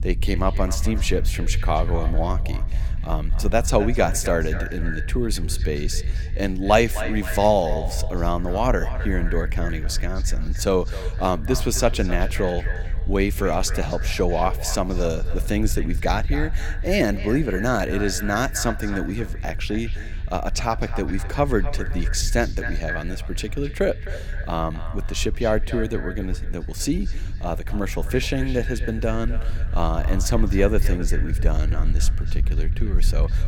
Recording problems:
echo of what is said; noticeable; throughout; 260 ms later, 10 dB below the speech
low rumble; faint; throughout; 20 dB below the speech

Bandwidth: 17.5 kHz